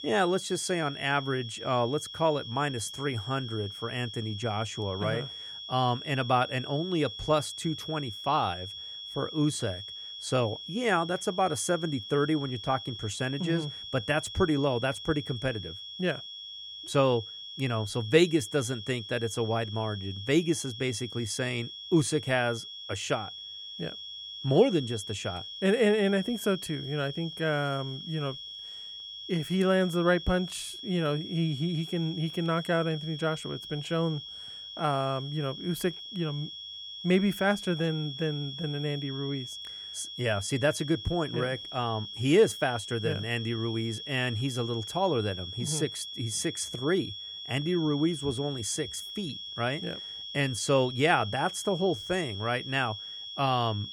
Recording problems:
high-pitched whine; loud; throughout; 3.5 kHz, 9 dB below the speech

